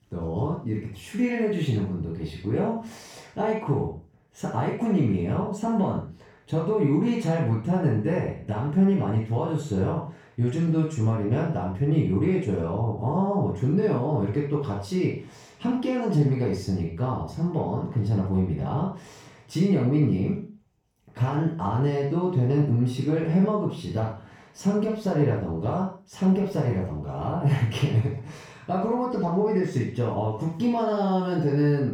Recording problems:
off-mic speech; far
room echo; noticeable; dies away in 0.4 s

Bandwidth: 18 kHz